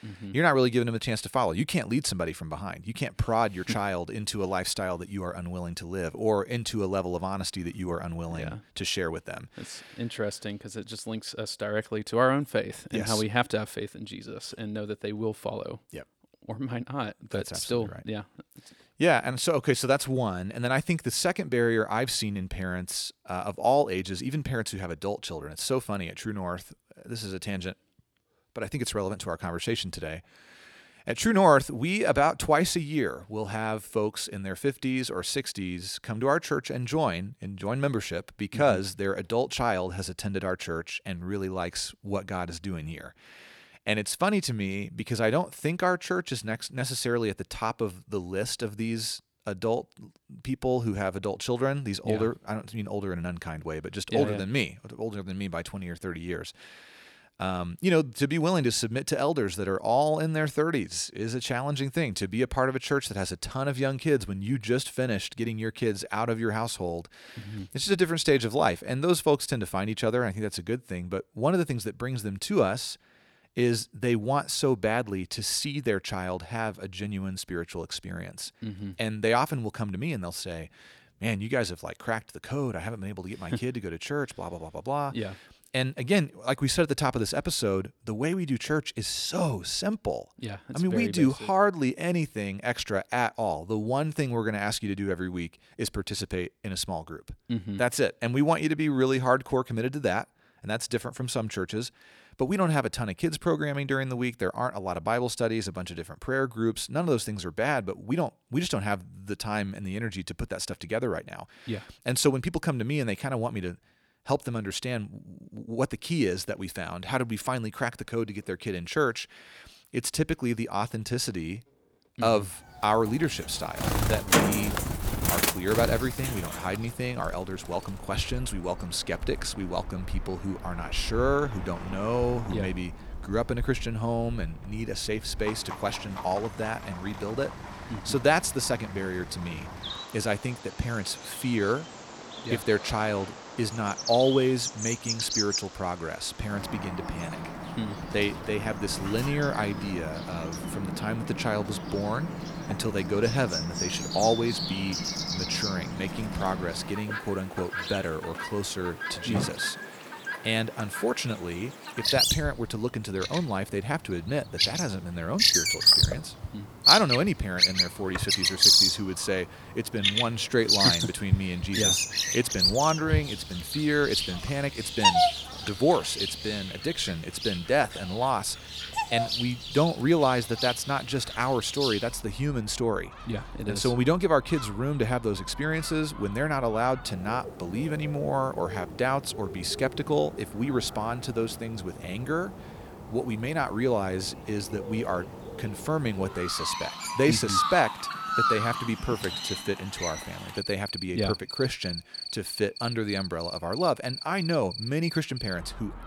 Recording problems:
animal sounds; very loud; from 2:03 on; 1 dB above the speech

